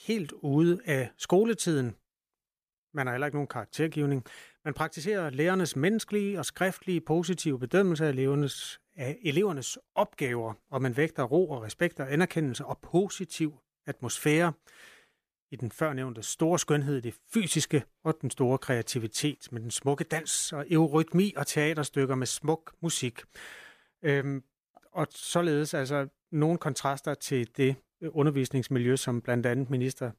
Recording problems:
none

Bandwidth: 14.5 kHz